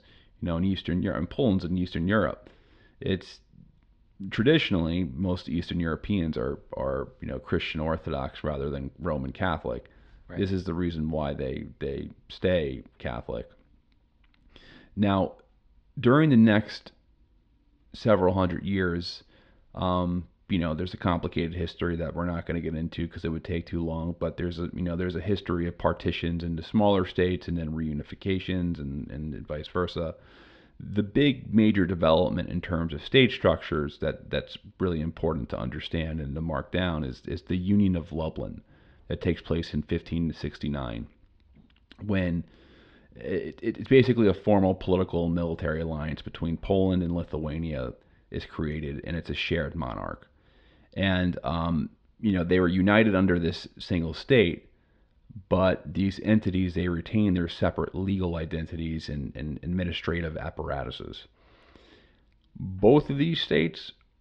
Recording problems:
muffled; very slightly; fading above 4 kHz

